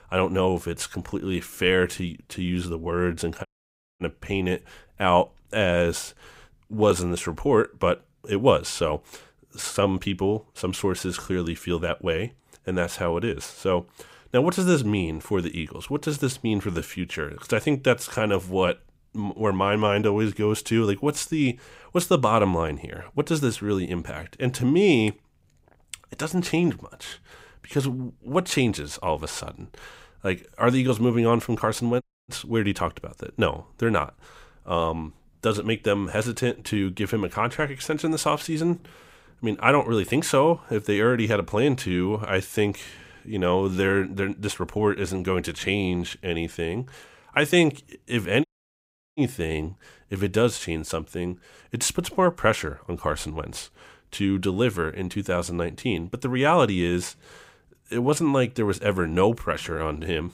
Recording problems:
audio cutting out; at 3.5 s for 0.5 s, at 32 s and at 48 s for 0.5 s

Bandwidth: 15.5 kHz